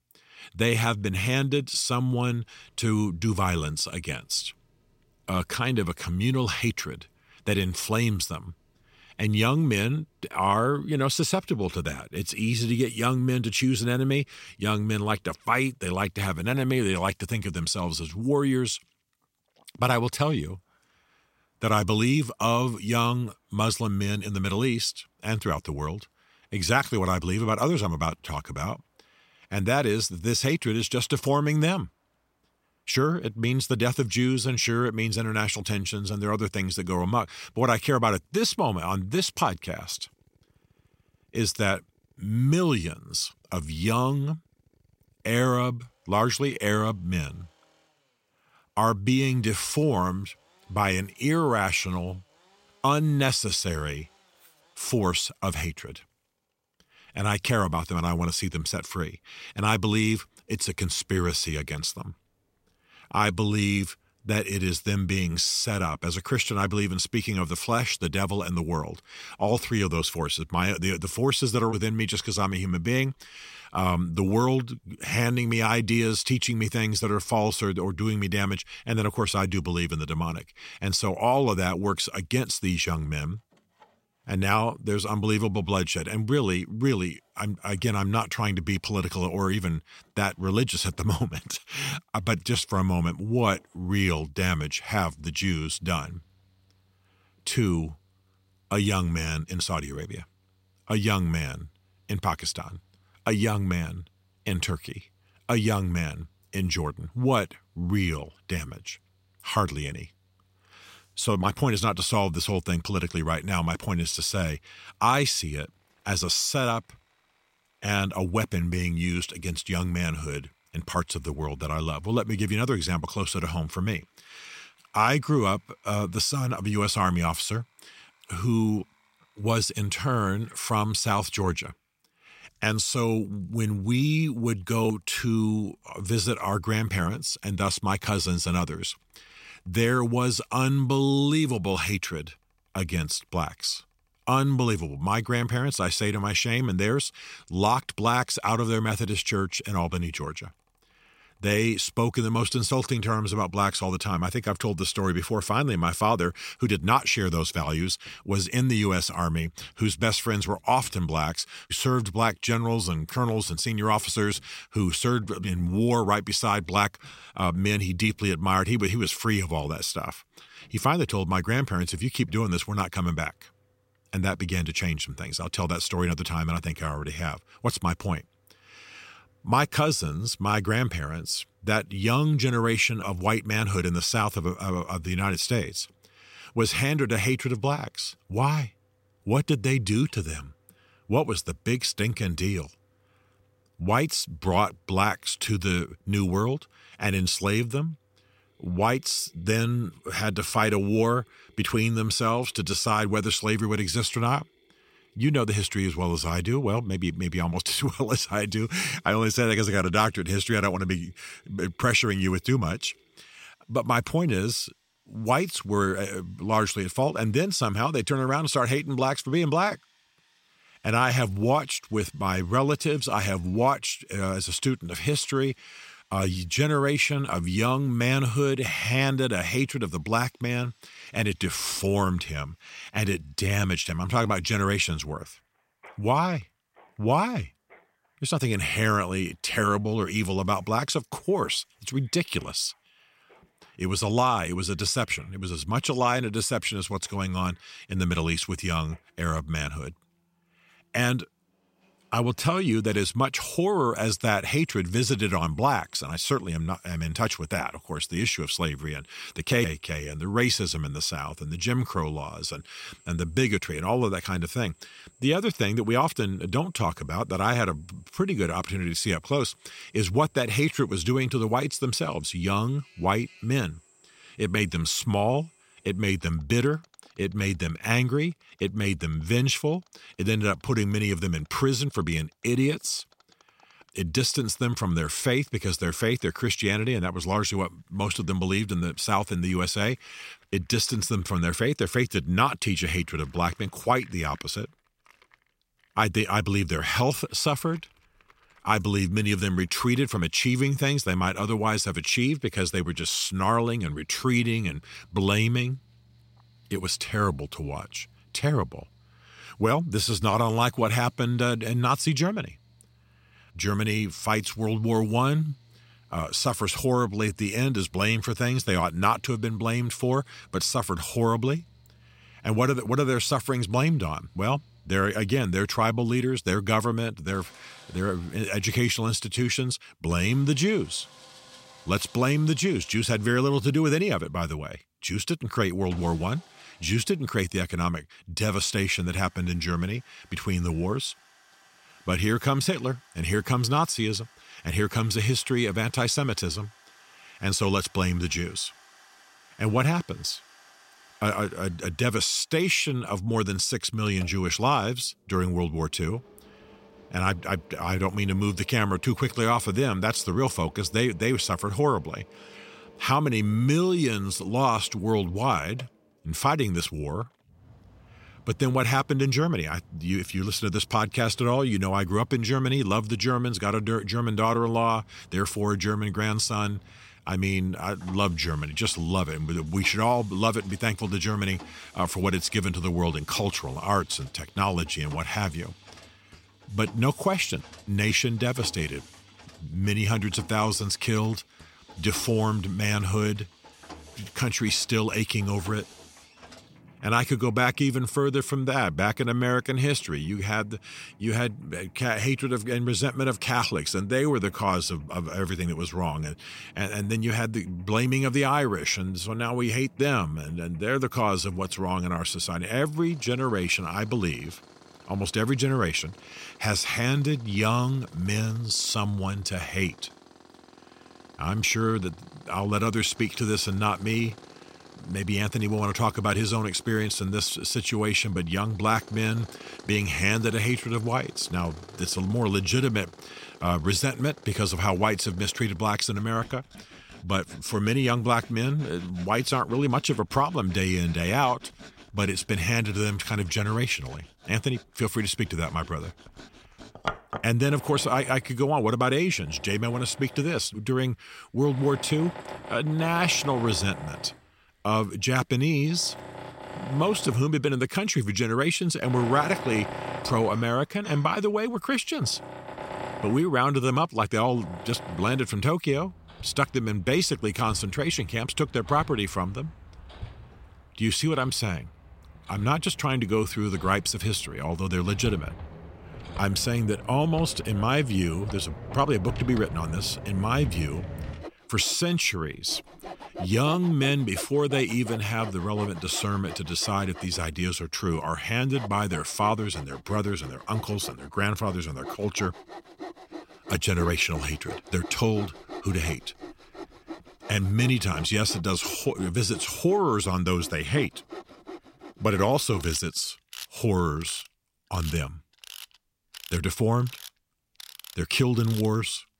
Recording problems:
machinery noise; noticeable; throughout; 20 dB below the speech

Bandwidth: 16 kHz